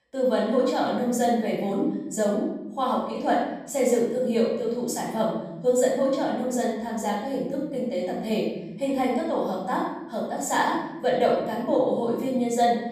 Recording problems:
off-mic speech; far
room echo; noticeable; dies away in 1.5 s

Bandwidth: 14.5 kHz